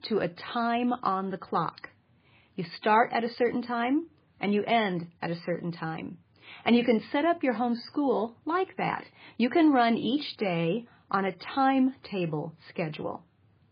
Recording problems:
garbled, watery; badly; nothing above 4.5 kHz

